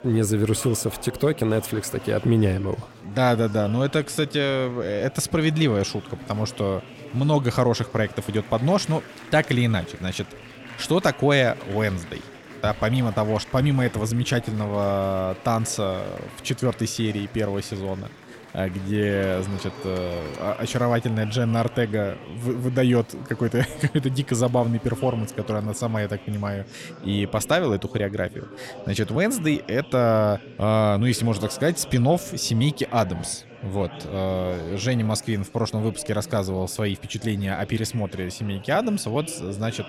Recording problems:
murmuring crowd; noticeable; throughout; 15 dB below the speech

